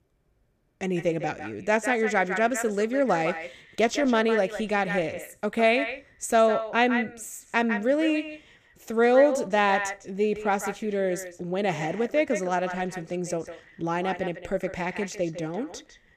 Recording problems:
echo of what is said; strong; throughout; 150 ms later, 10 dB below the speech

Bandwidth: 14.5 kHz